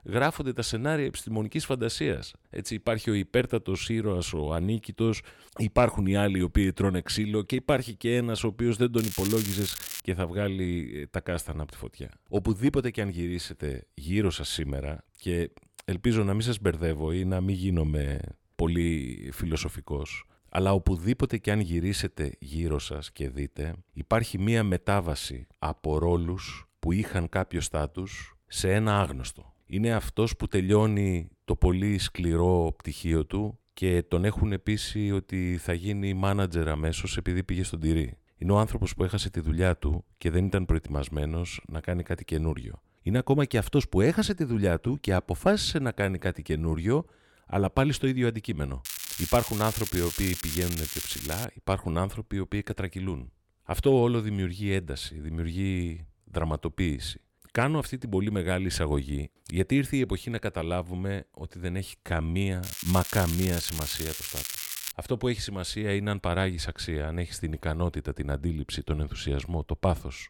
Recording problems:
crackling; loud; from 9 to 10 s, from 49 to 51 s and from 1:03 to 1:05; 5 dB below the speech

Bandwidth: 17.5 kHz